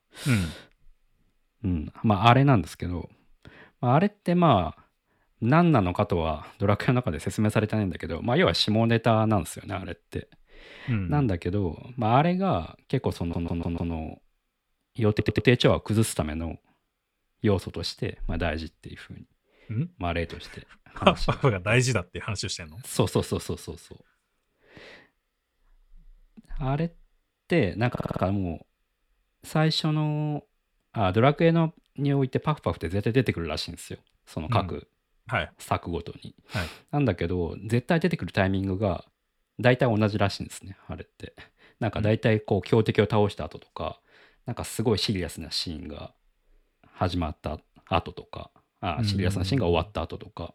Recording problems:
audio stuttering; at 13 s, at 15 s and at 28 s

